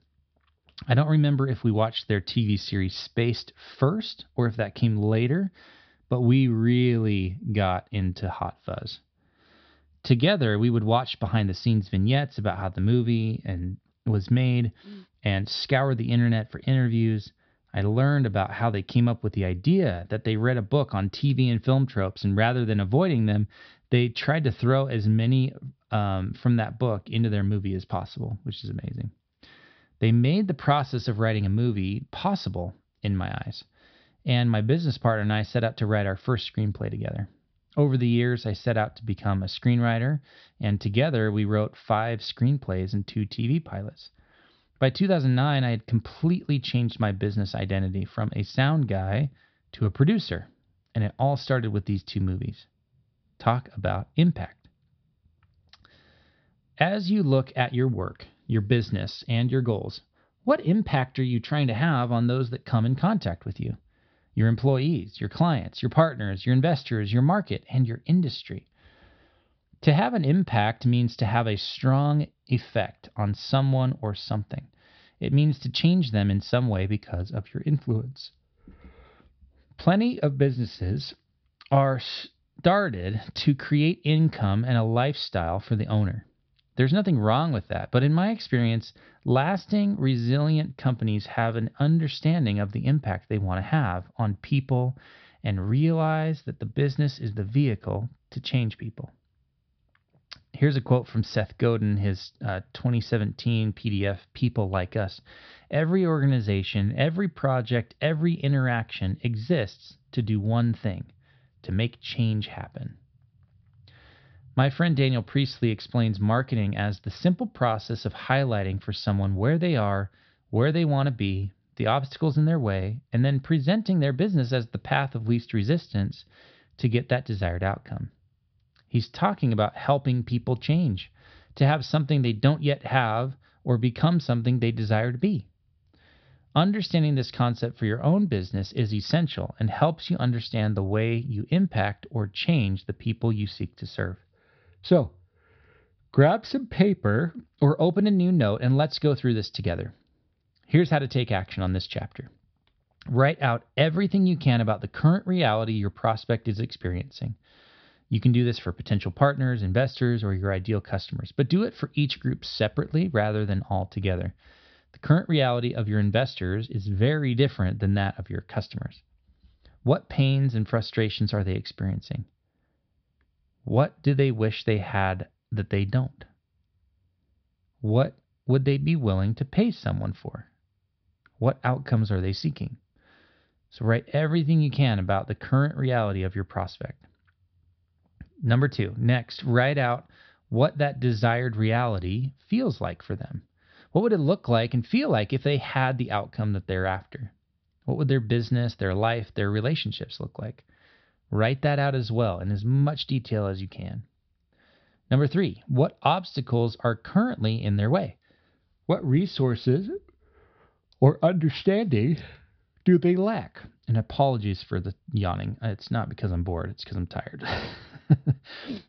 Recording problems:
high frequencies cut off; noticeable; nothing above 5.5 kHz

